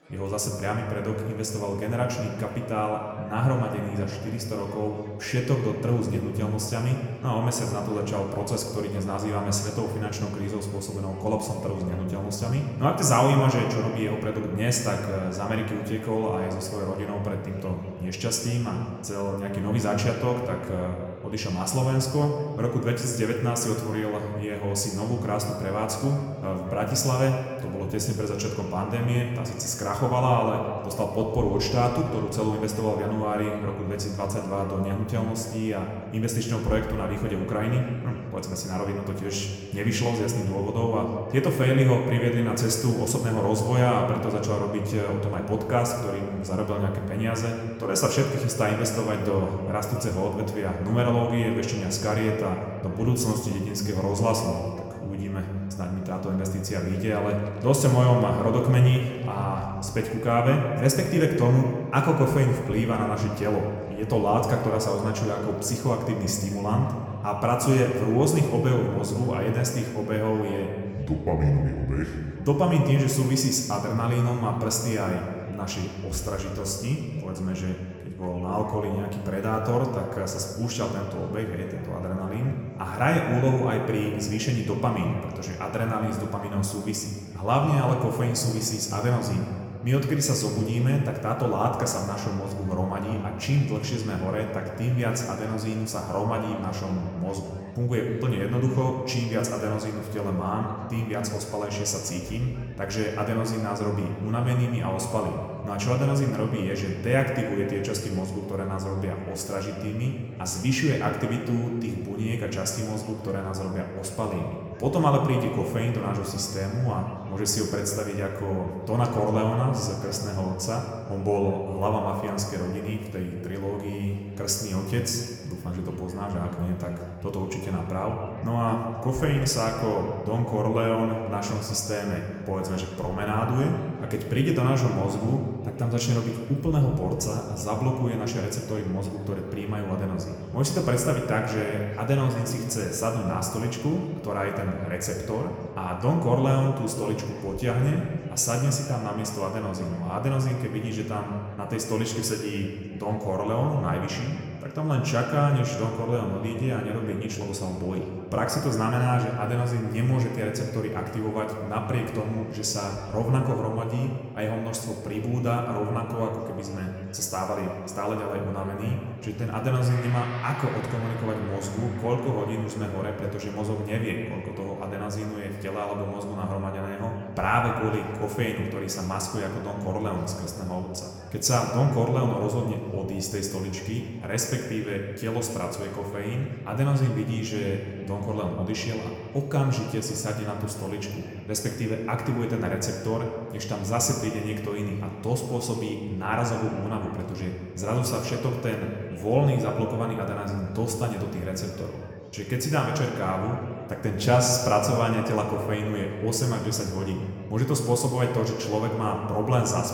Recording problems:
room echo; noticeable; dies away in 1.8 s
off-mic speech; somewhat distant
chatter from many people; faint; throughout; 25 dB below the speech
background music; very faint; throughout; 30 dB below the speech

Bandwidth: 18 kHz